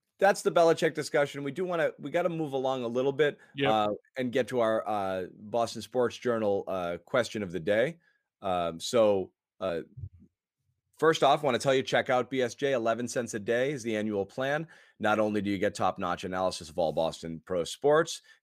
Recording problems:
none

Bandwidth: 15 kHz